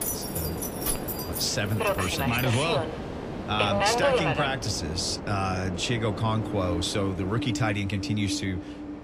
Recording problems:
train or aircraft noise; loud; throughout; 2 dB below the speech
jangling keys; noticeable; until 2.5 s; peak 1 dB below the speech

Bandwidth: 15 kHz